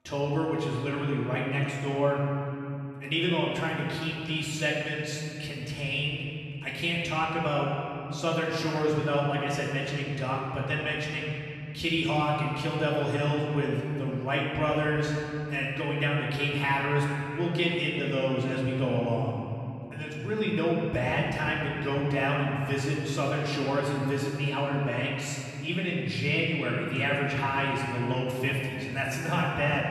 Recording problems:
off-mic speech; far
room echo; noticeable; dies away in 3 s

